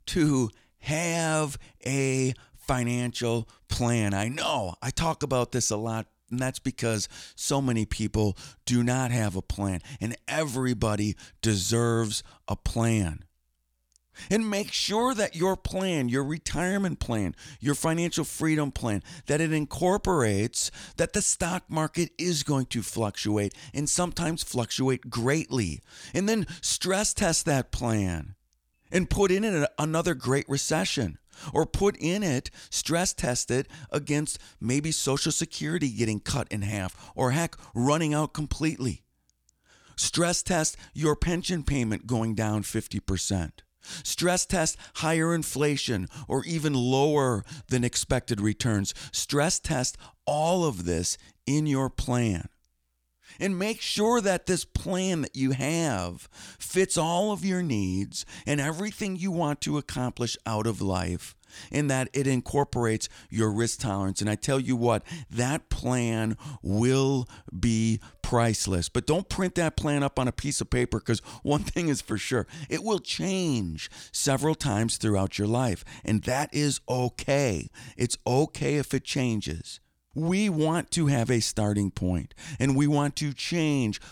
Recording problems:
none

